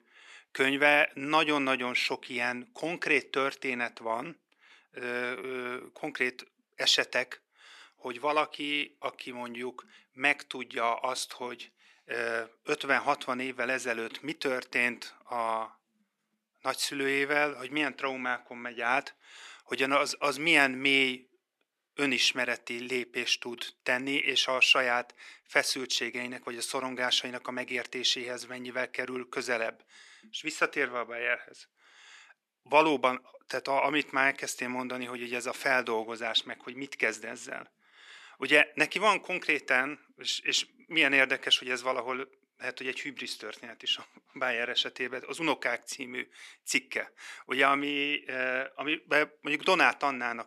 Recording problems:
thin; somewhat; fading below 300 Hz

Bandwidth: 13.5 kHz